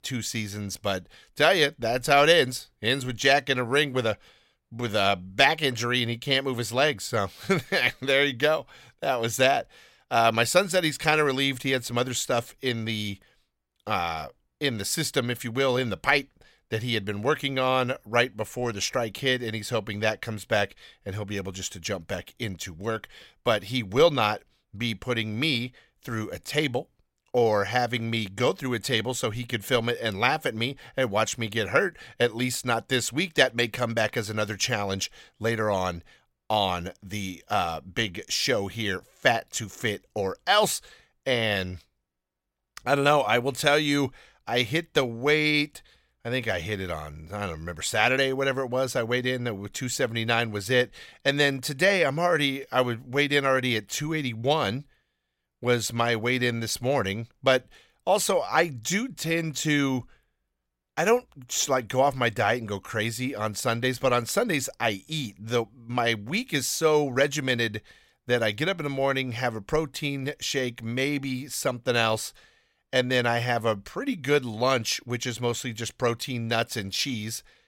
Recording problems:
none

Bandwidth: 16 kHz